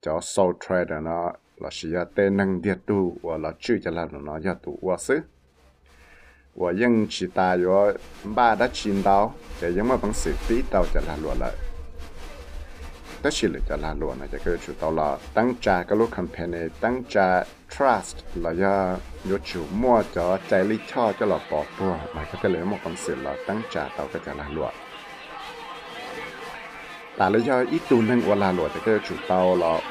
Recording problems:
crowd noise; noticeable; throughout; 15 dB below the speech

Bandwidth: 15 kHz